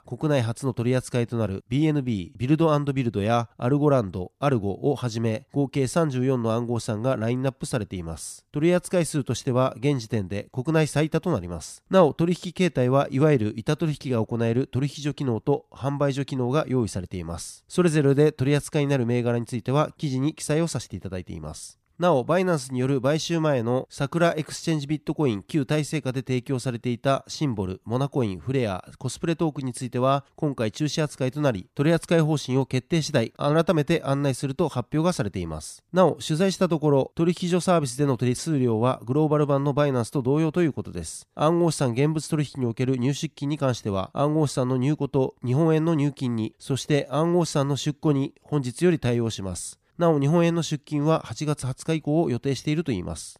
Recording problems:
none

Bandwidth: 14.5 kHz